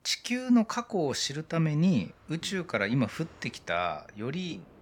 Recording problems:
train or aircraft noise; faint; throughout; 30 dB below the speech

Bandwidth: 17 kHz